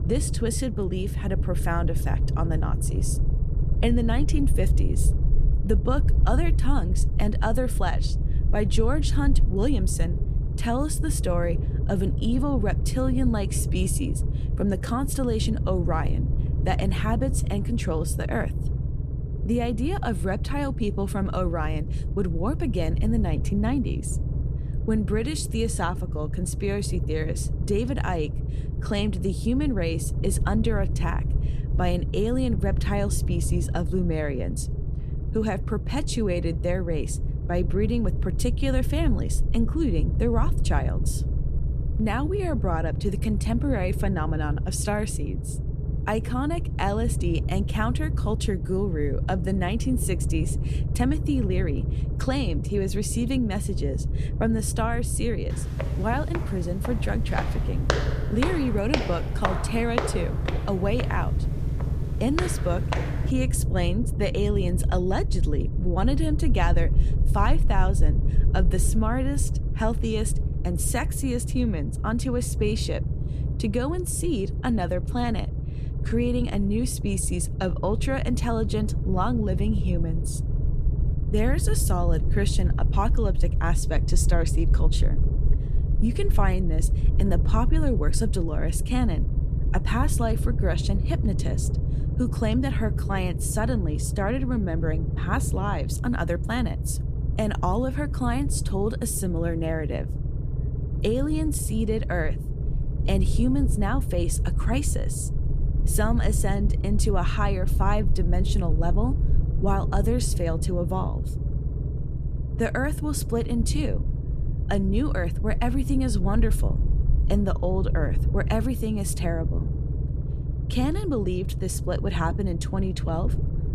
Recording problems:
low rumble; noticeable; throughout; 10 dB below the speech
footsteps; loud; from 56 s to 1:03; peak 1 dB above the speech

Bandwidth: 14.5 kHz